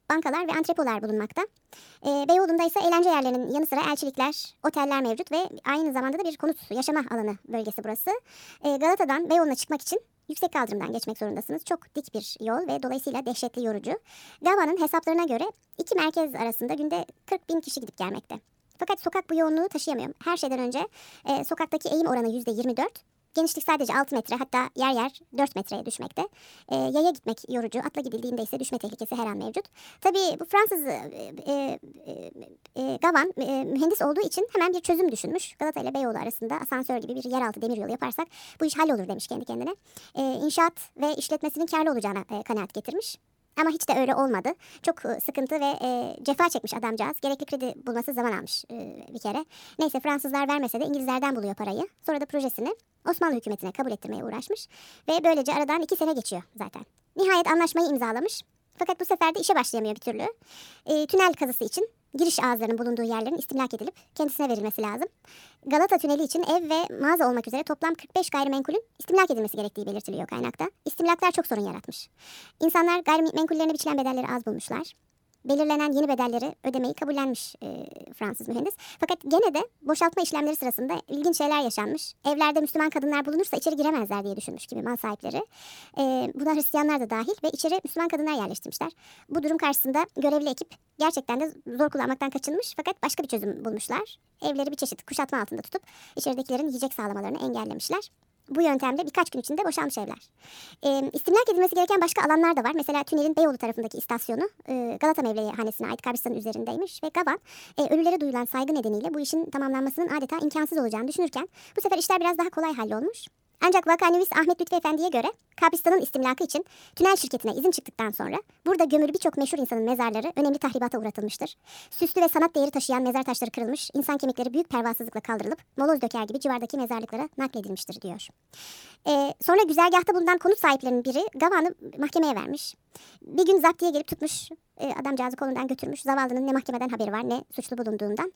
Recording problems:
wrong speed and pitch; too fast and too high; 1.5 times normal speed

